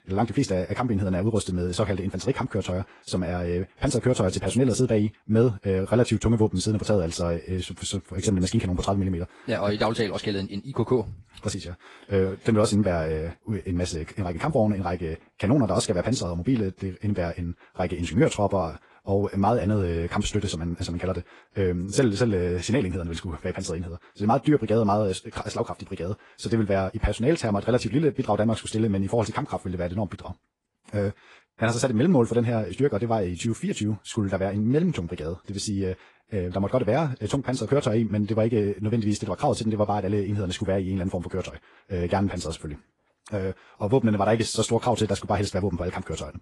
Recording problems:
wrong speed, natural pitch; too fast; 1.5 times normal speed
garbled, watery; slightly; nothing above 10 kHz

